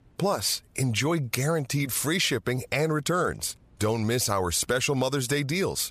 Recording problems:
squashed, flat; somewhat

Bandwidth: 14.5 kHz